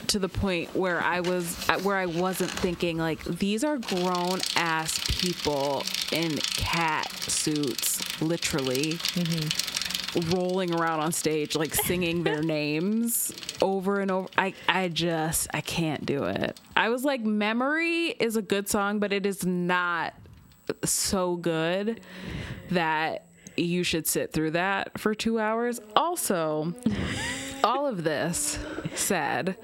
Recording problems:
squashed, flat; heavily, background pumping
traffic noise; loud; throughout; 6 dB below the speech

